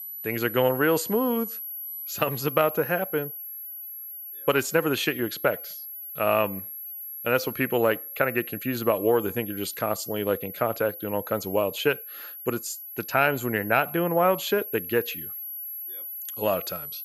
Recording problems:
high-pitched whine; loud; throughout; 11.5 kHz, 9 dB below the speech

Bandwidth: 14.5 kHz